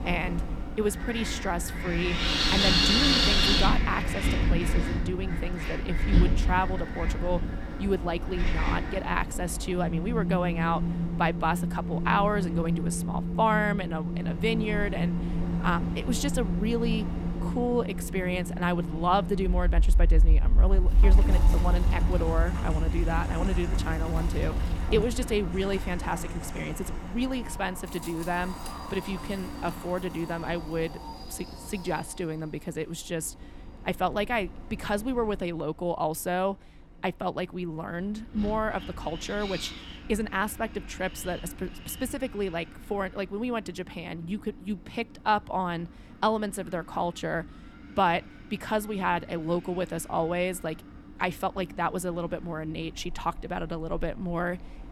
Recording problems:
wind in the background; very loud; throughout; 2 dB above the speech

